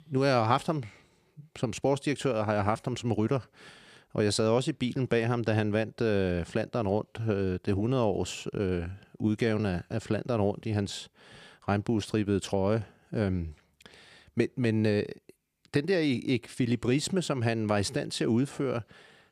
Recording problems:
none

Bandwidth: 15 kHz